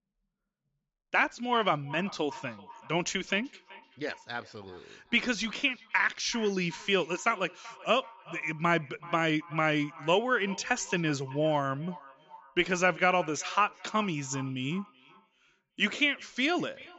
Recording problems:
high frequencies cut off; noticeable; nothing above 7.5 kHz
echo of what is said; faint; throughout; 380 ms later, 20 dB below the speech

